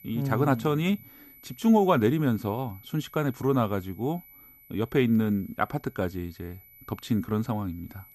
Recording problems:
high-pitched whine; faint; throughout; 12 kHz, 25 dB below the speech

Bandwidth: 14.5 kHz